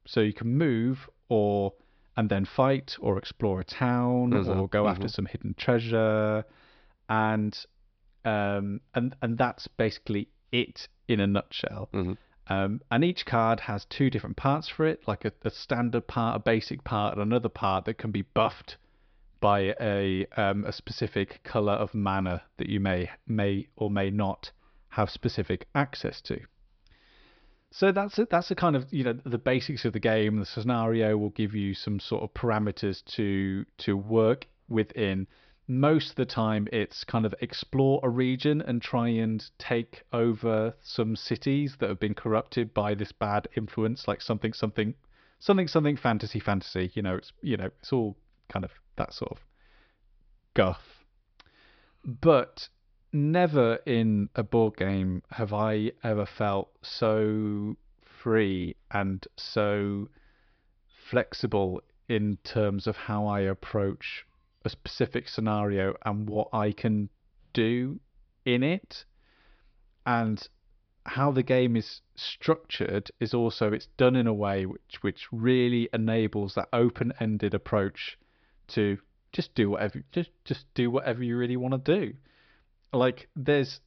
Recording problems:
high frequencies cut off; noticeable; nothing above 5.5 kHz

